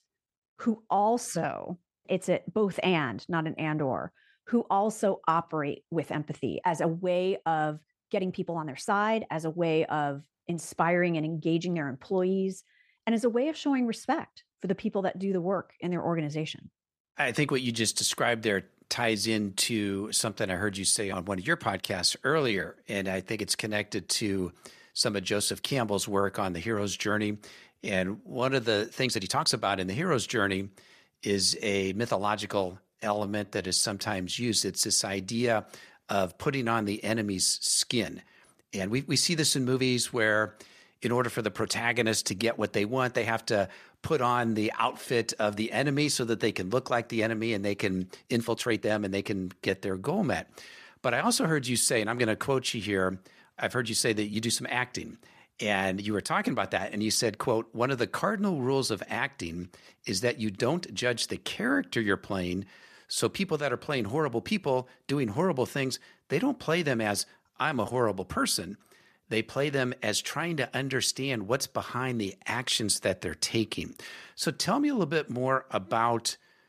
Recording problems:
uneven, jittery; strongly; from 8 s to 1:08

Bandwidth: 14.5 kHz